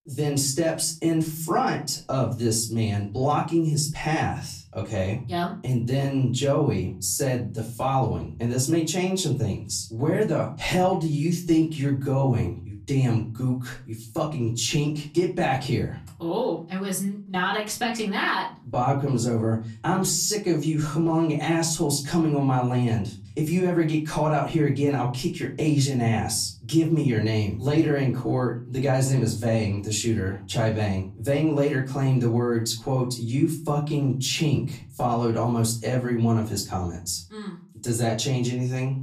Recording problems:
off-mic speech; far
room echo; very slight; dies away in 0.4 s

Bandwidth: 14.5 kHz